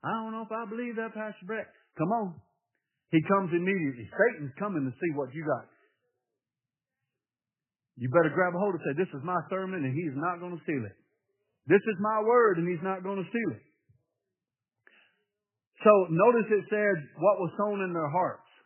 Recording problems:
garbled, watery; badly; nothing above 3 kHz
high-pitched whine; very faint; mostly in the pauses; 2 kHz, 85 dB below the speech

